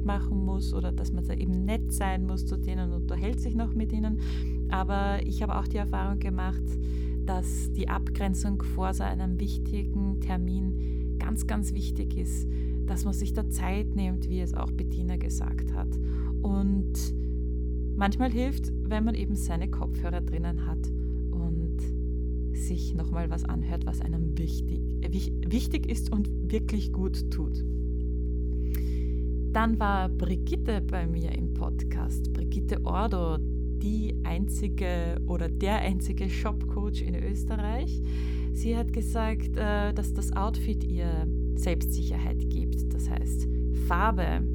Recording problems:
electrical hum; loud; throughout; 60 Hz, 7 dB below the speech

